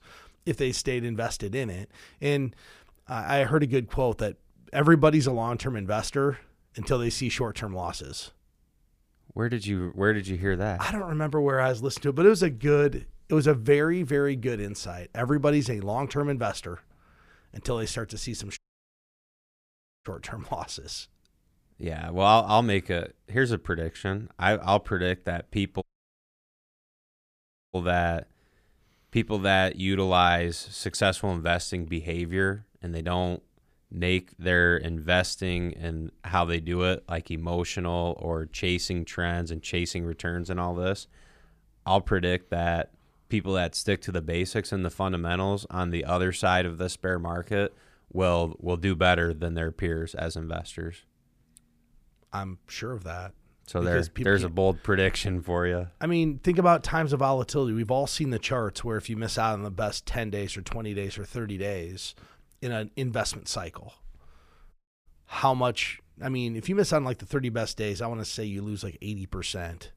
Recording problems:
audio cutting out; at 19 s for 1.5 s, at 26 s for 2 s and at 1:05

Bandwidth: 15 kHz